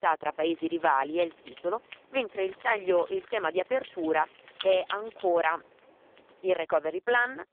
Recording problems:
phone-call audio; poor line; nothing above 3 kHz
jangling keys; noticeable; from 1 to 5 s; peak 8 dB below the speech

